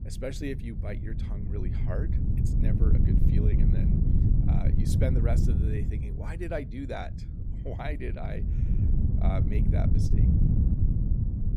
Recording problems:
wind noise on the microphone; heavy; as loud as the speech

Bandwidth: 15 kHz